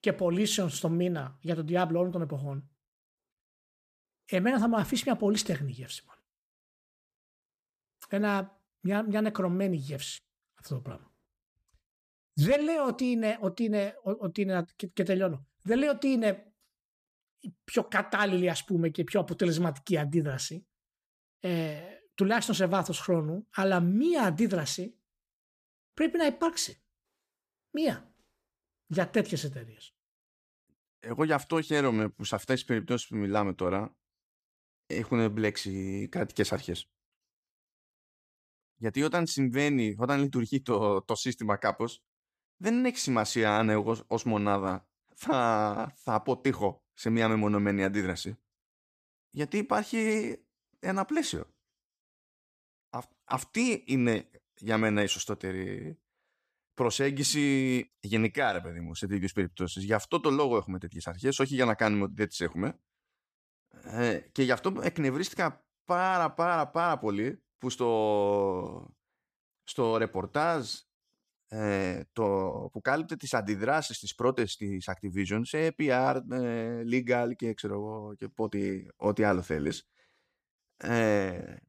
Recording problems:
none

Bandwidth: 14.5 kHz